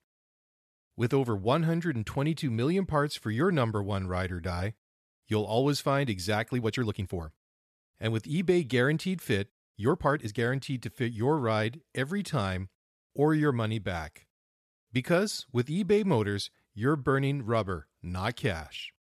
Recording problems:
uneven, jittery; strongly; from 1 to 10 s

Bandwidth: 14 kHz